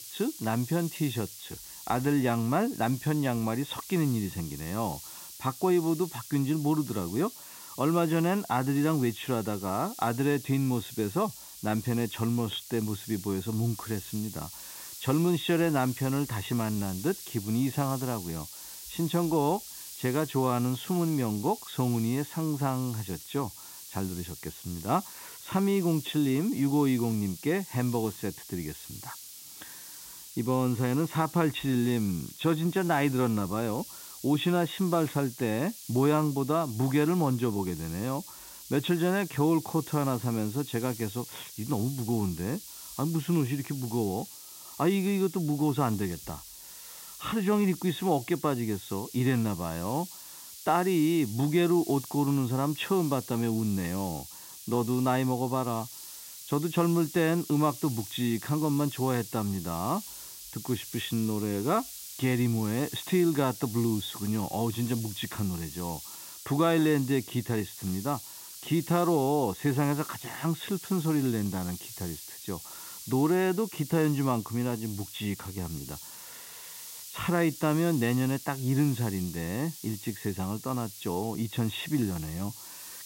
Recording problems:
high frequencies cut off; severe; nothing above 4 kHz
hiss; noticeable; throughout; 10 dB below the speech

